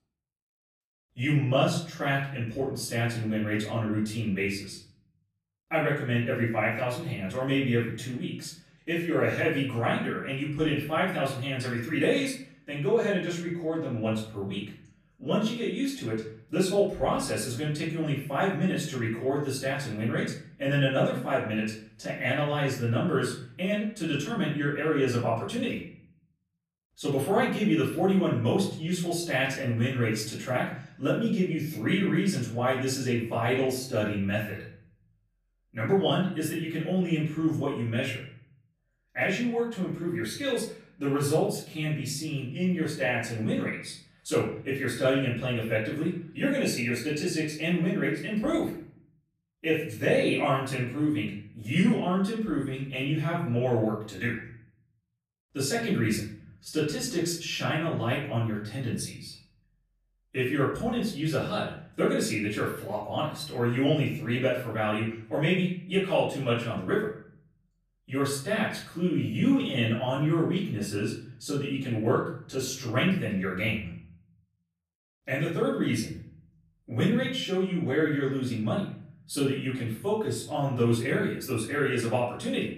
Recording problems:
off-mic speech; far
room echo; noticeable; dies away in 0.6 s

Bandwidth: 14.5 kHz